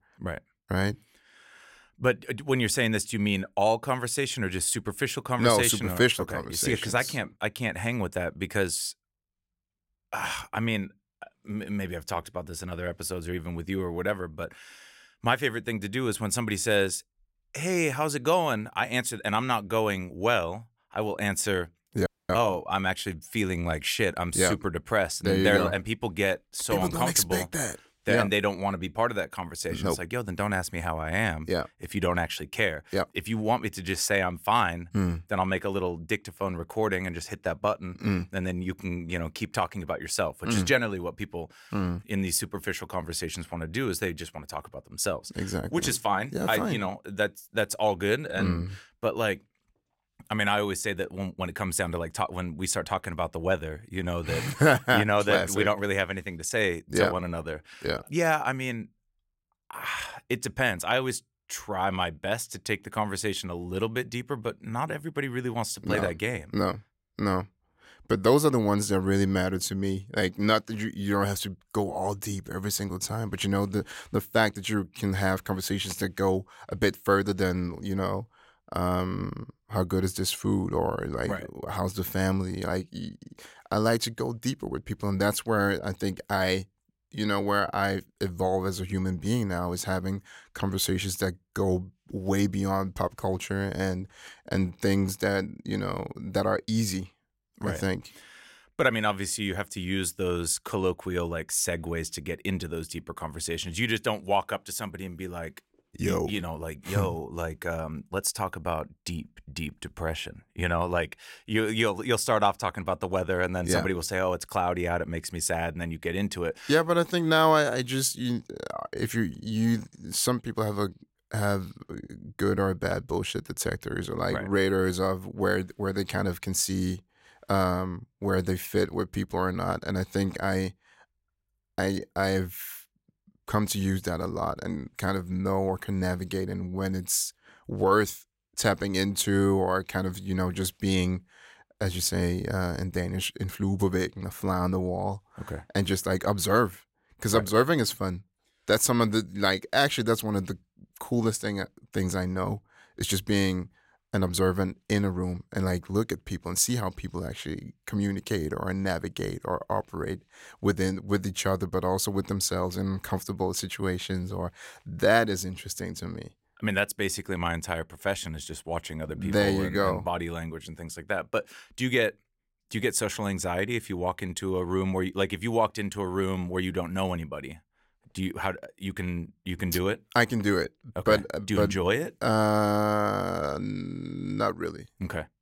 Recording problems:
audio cutting out; at 22 s

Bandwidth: 16 kHz